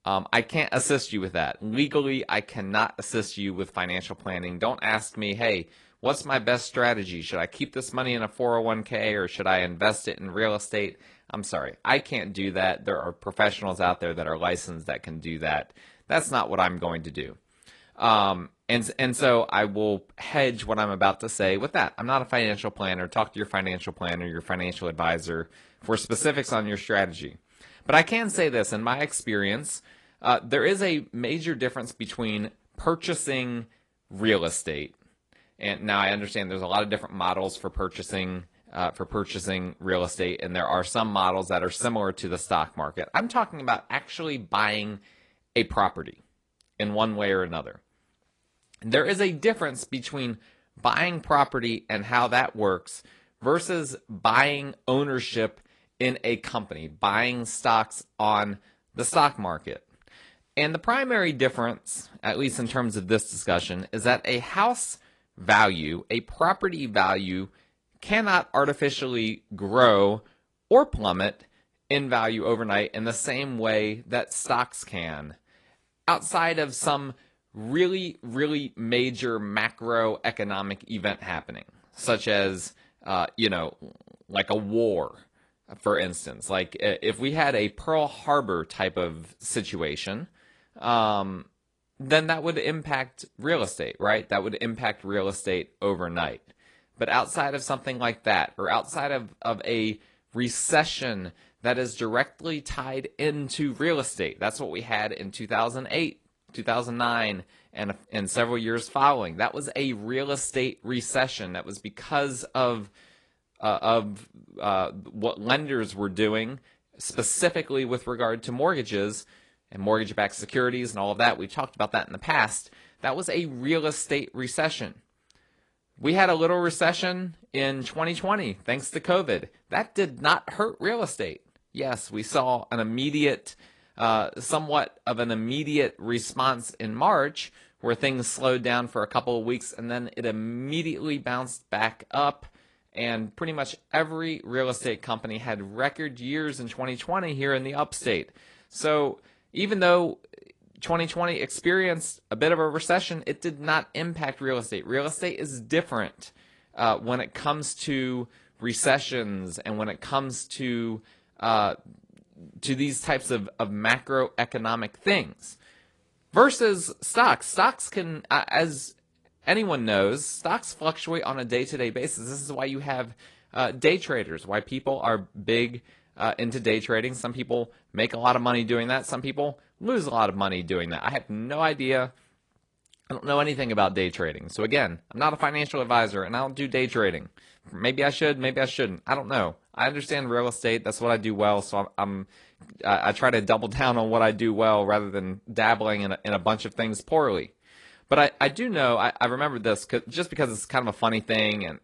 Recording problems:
garbled, watery; slightly; nothing above 10 kHz

